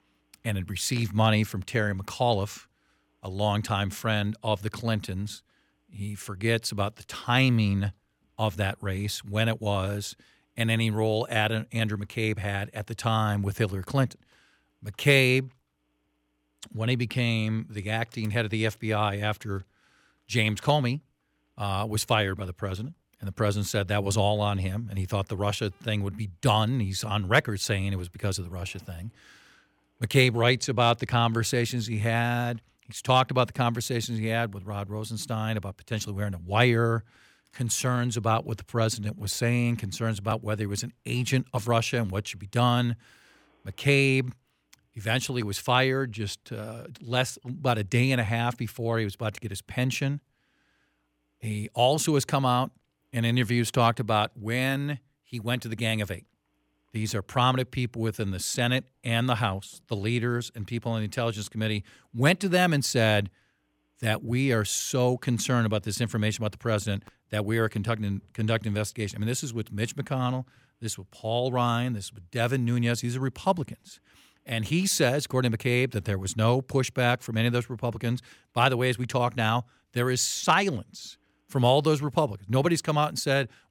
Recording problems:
none

